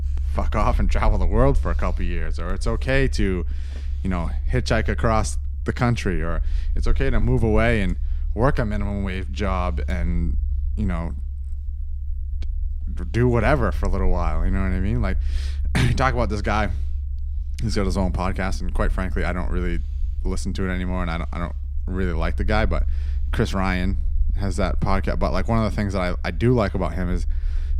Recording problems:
low rumble; faint; throughout; 20 dB below the speech

